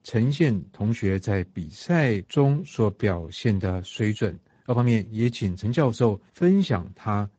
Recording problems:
garbled, watery; slightly; nothing above 7.5 kHz
uneven, jittery; strongly; from 0.5 to 6.5 s

